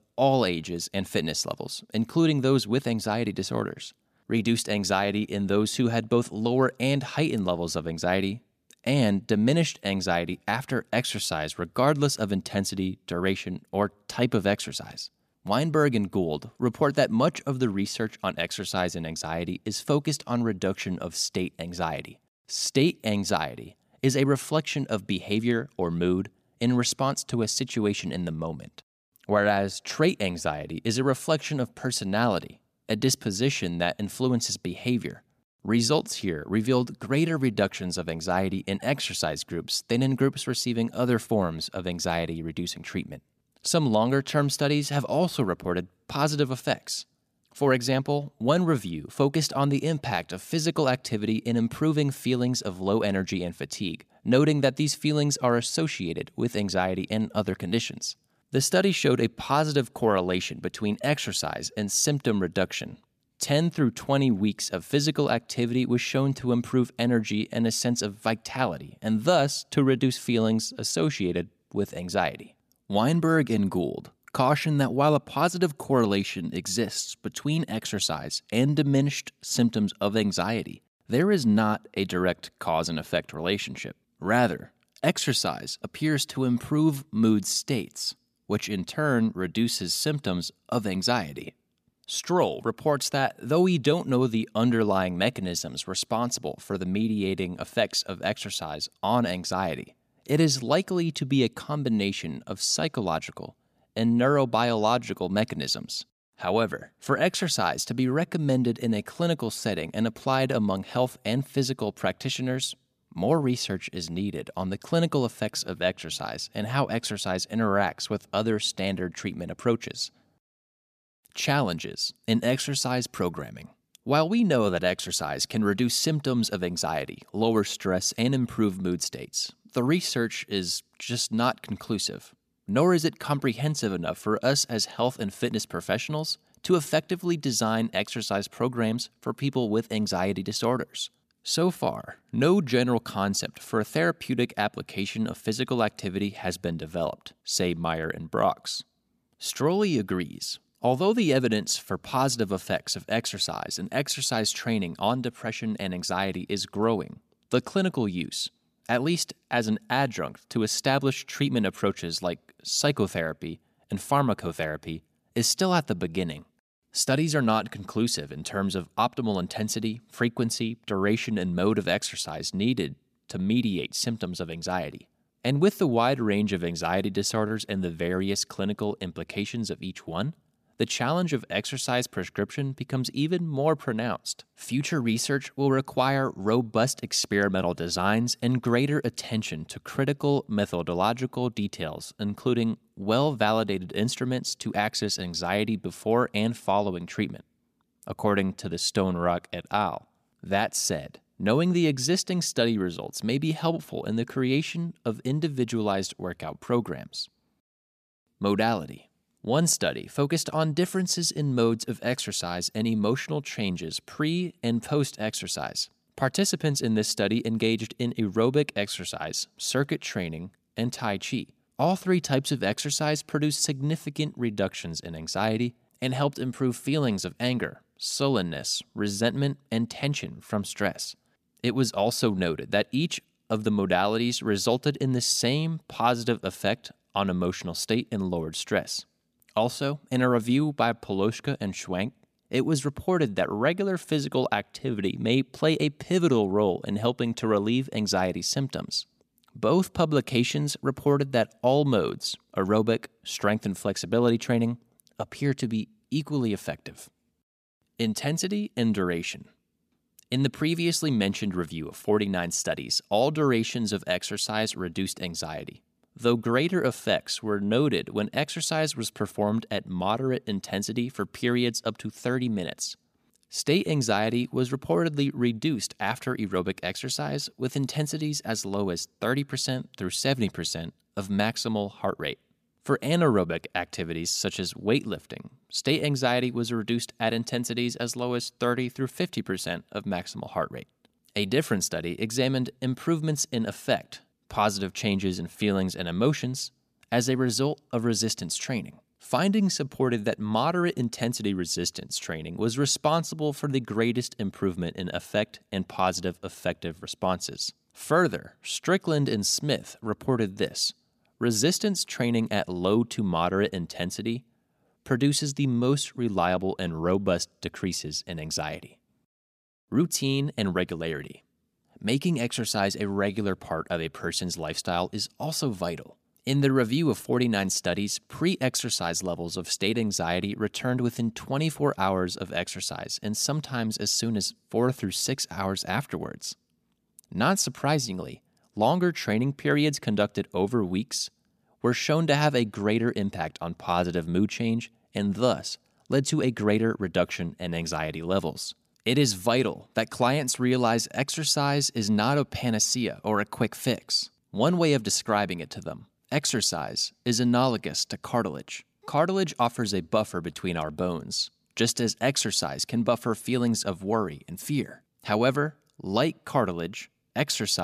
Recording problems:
abrupt cut into speech; at the end

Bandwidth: 14.5 kHz